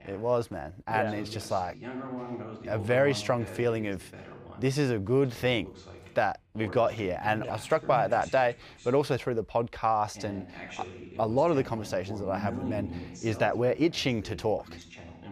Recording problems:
voice in the background; noticeable; throughout; 15 dB below the speech

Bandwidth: 15.5 kHz